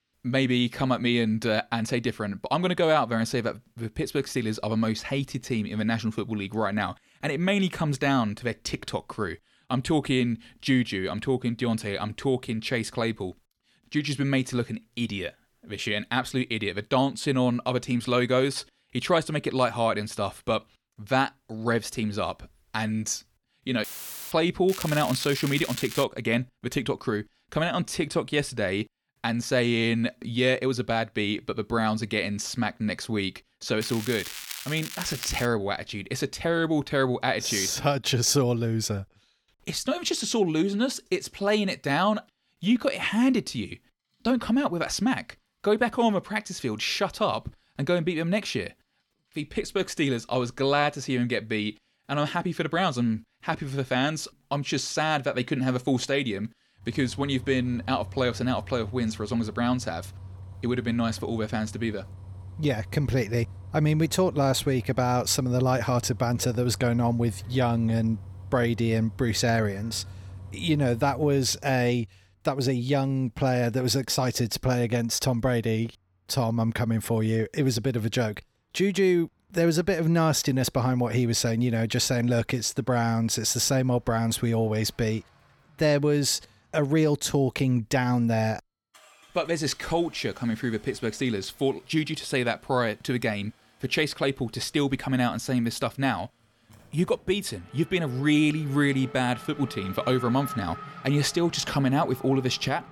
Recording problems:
crackling; loud; from 25 to 26 s and from 34 to 35 s; 10 dB below the speech
traffic noise; noticeable; from 44 s on; 15 dB below the speech
audio cutting out; filled with static; at 24 s

